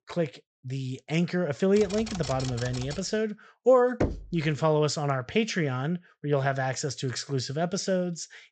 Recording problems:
high frequencies cut off; noticeable; nothing above 8 kHz
keyboard typing; noticeable; from 2 to 3 s; peak 9 dB below the speech
door banging; noticeable; at 4 s; peak 3 dB below the speech

